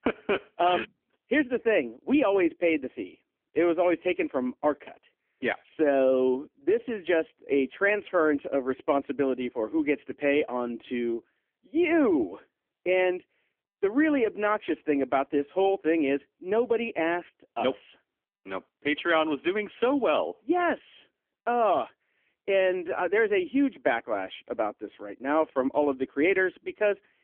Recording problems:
phone-call audio; poor line; nothing above 3.5 kHz

